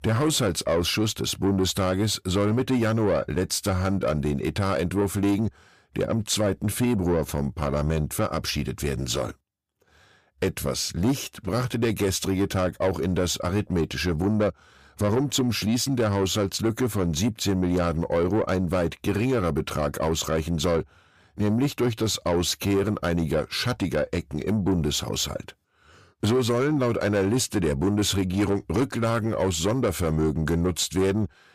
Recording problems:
distortion; slight; 10 dB below the speech

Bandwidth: 15 kHz